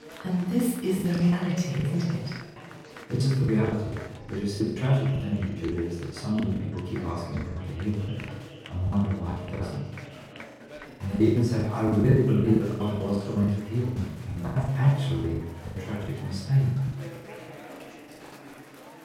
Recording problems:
off-mic speech; far
room echo; noticeable; dies away in 0.9 s
chatter from many people; noticeable; throughout; 15 dB below the speech
choppy; very; 16% of the speech affected

